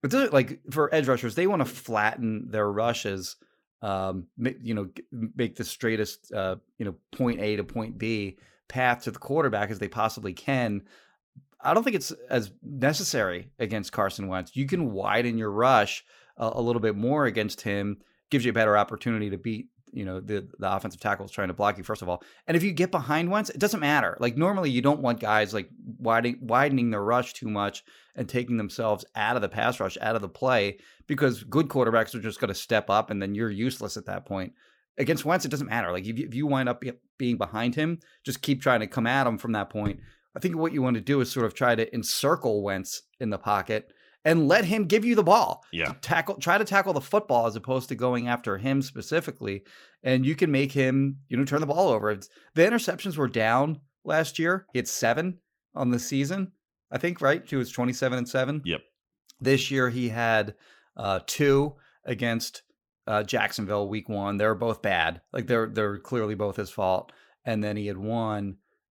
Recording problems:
uneven, jittery; strongly; from 0.5 s to 1:06

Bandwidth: 17.5 kHz